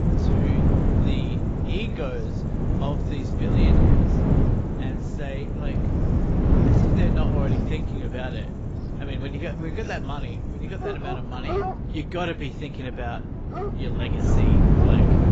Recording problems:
garbled, watery; badly; nothing above 7.5 kHz
animal sounds; very loud; throughout; as loud as the speech
wind noise on the microphone; heavy; 3 dB above the speech

